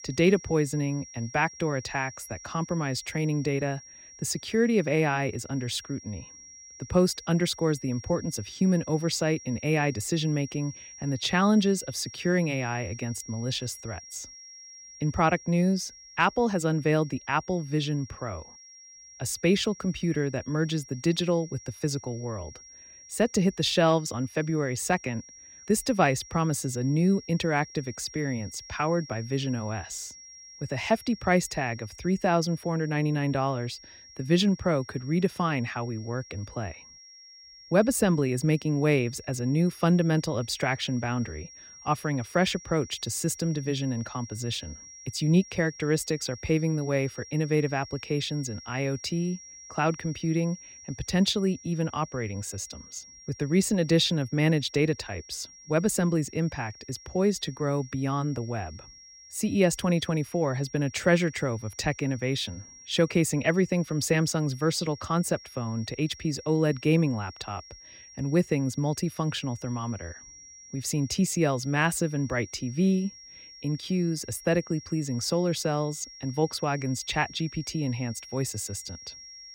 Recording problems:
high-pitched whine; noticeable; throughout; 5.5 kHz, 20 dB below the speech

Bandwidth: 16 kHz